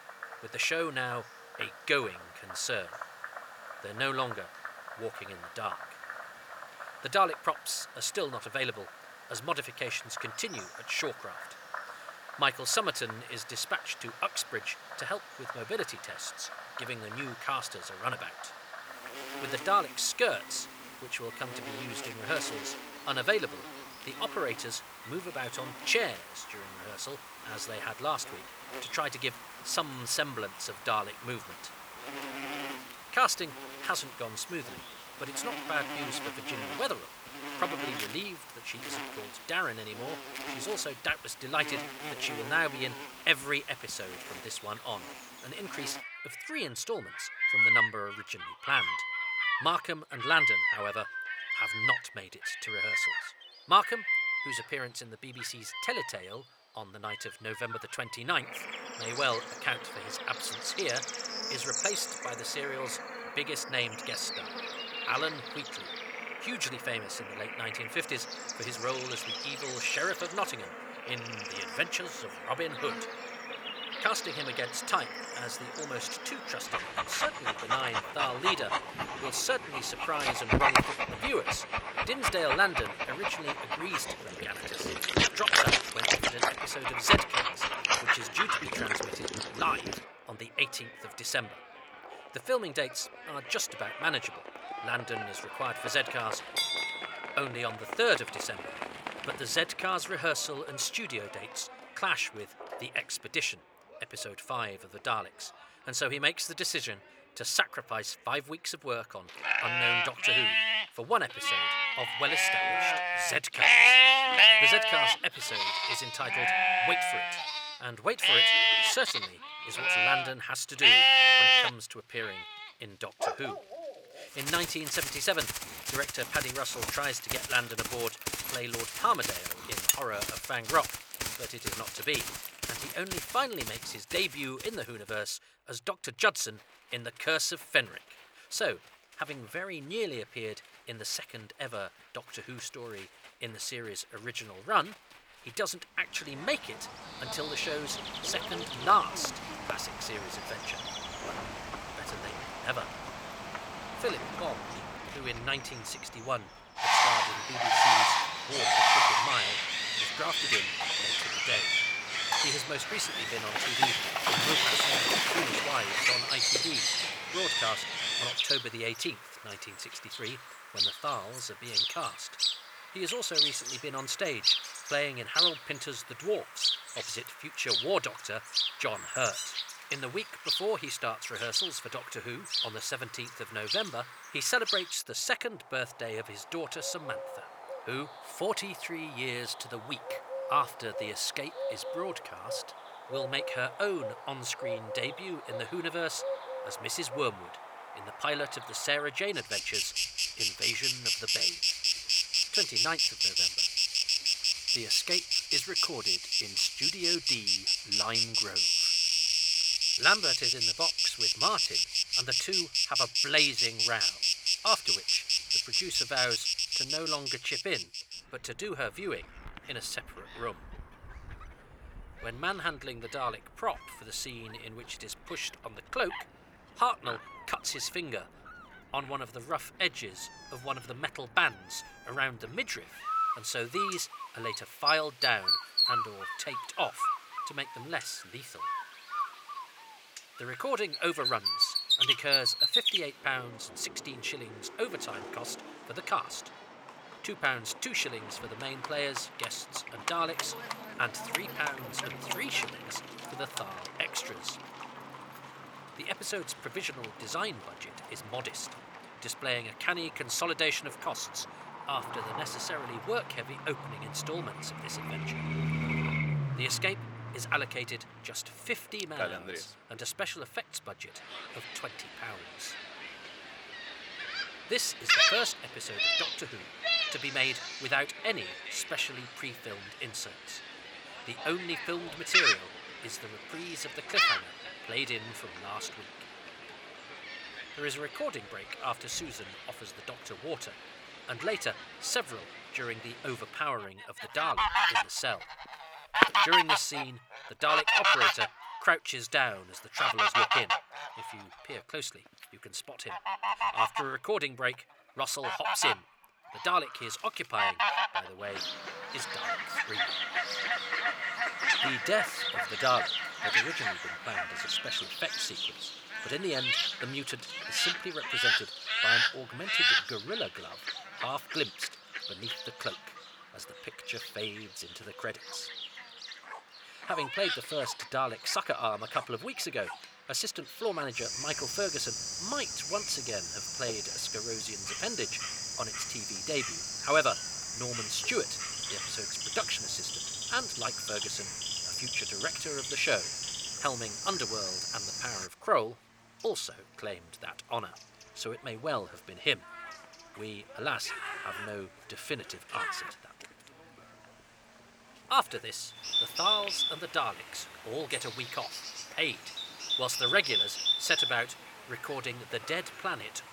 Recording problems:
thin; somewhat; fading below 550 Hz
animal sounds; very loud; throughout; 5 dB above the speech

